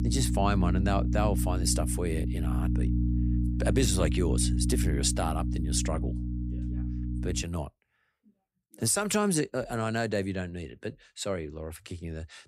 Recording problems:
electrical hum; loud; until 7.5 s; 60 Hz, 8 dB below the speech

